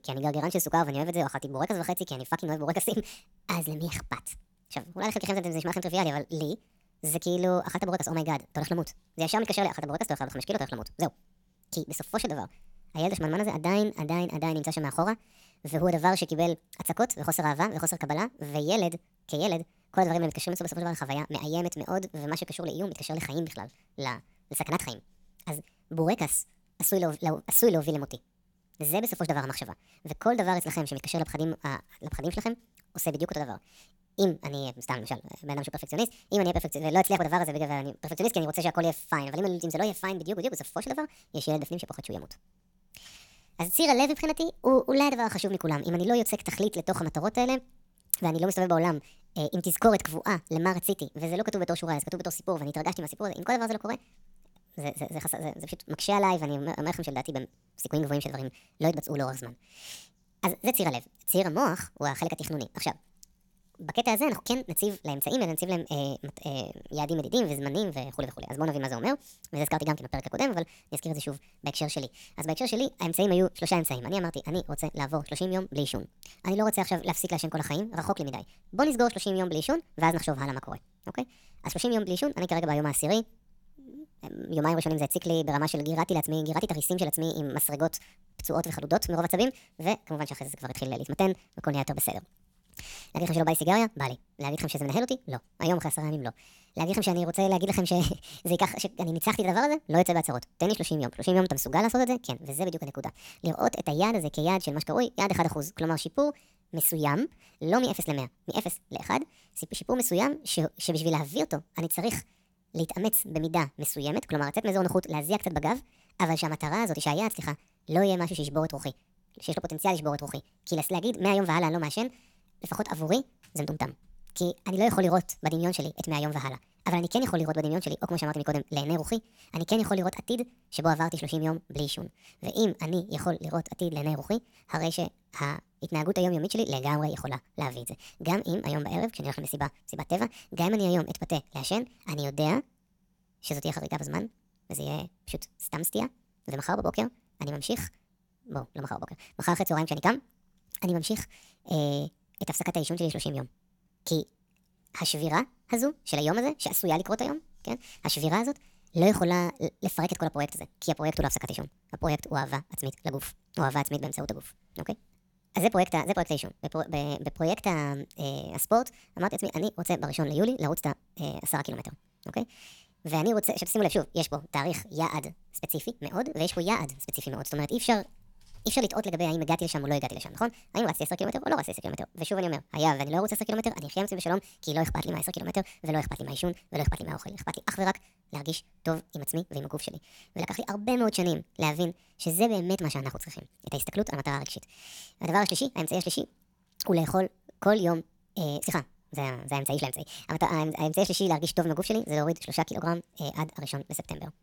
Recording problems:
wrong speed and pitch; too fast and too high; 1.5 times normal speed

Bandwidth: 17.5 kHz